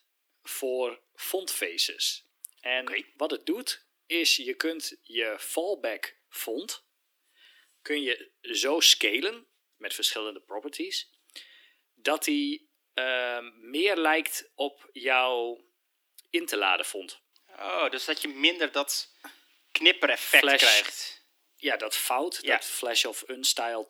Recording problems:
thin; somewhat; fading below 300 Hz

